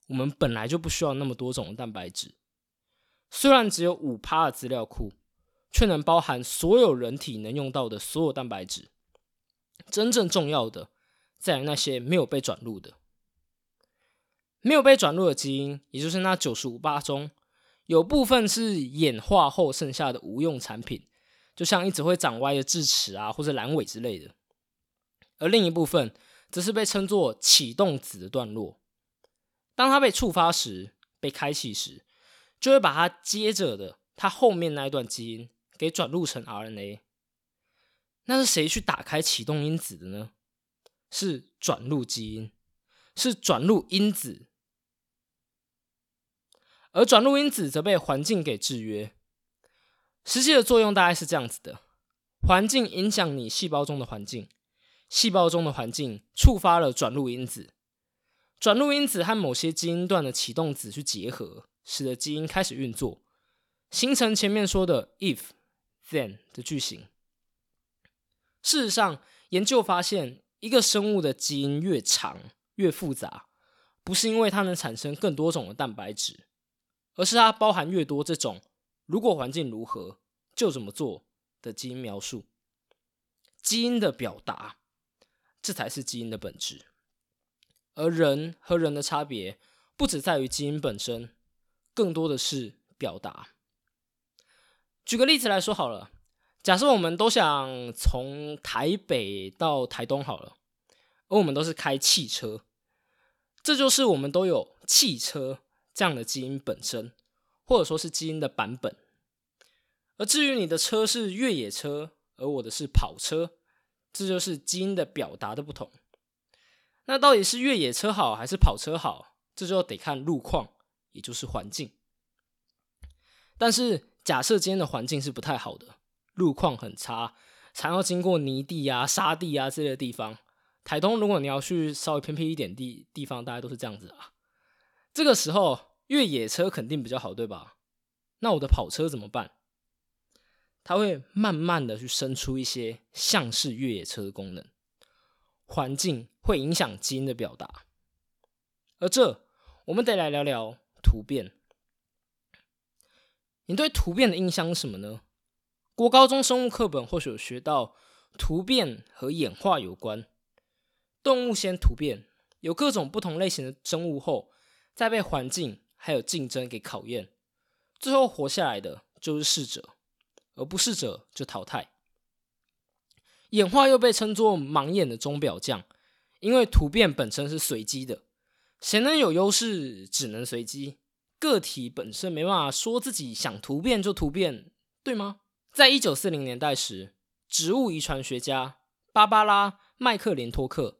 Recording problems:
uneven, jittery; slightly; from 24 s to 3:03

